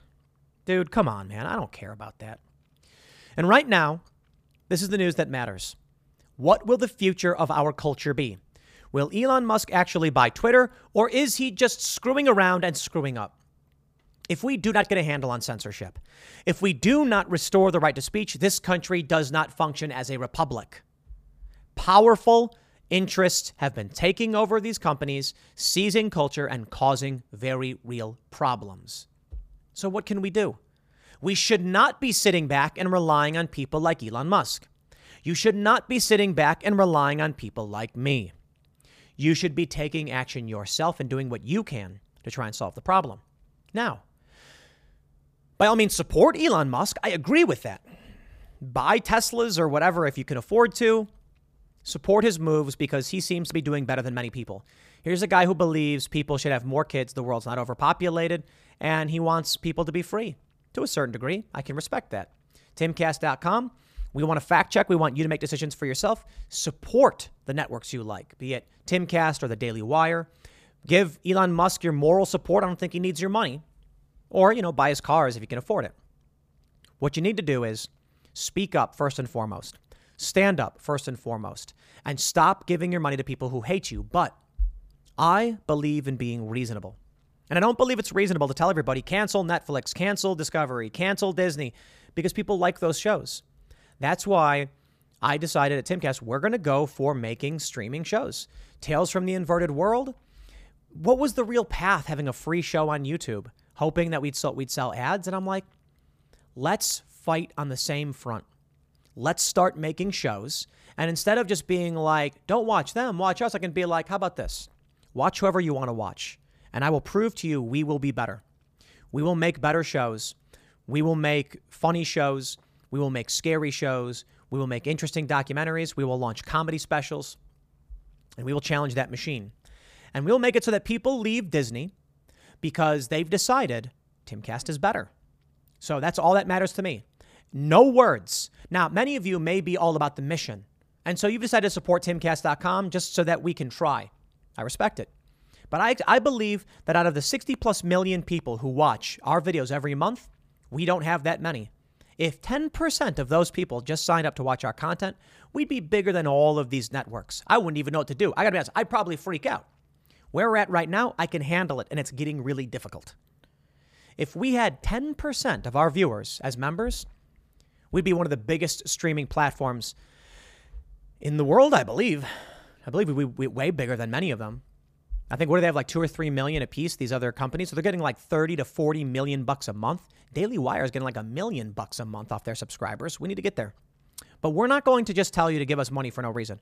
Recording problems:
none

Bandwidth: 15 kHz